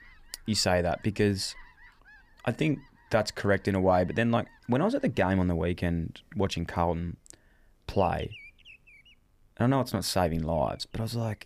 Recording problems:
animal sounds; faint; throughout; 25 dB below the speech

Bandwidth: 15 kHz